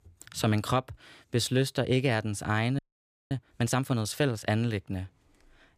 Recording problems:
audio freezing; at 3 s for 0.5 s

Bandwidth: 15 kHz